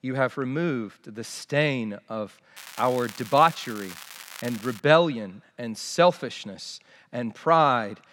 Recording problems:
crackling; noticeable; from 2.5 to 5 s; 15 dB below the speech

